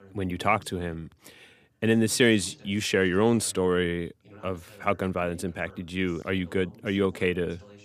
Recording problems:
voice in the background; faint; throughout; 25 dB below the speech

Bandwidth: 15 kHz